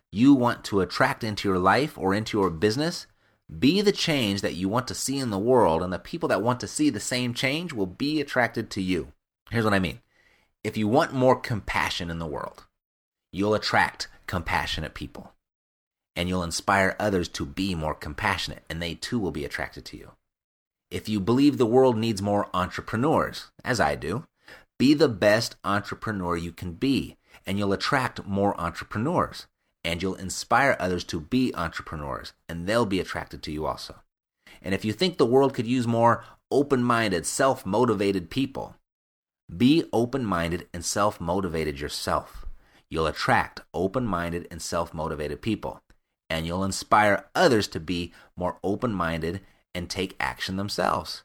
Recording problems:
none

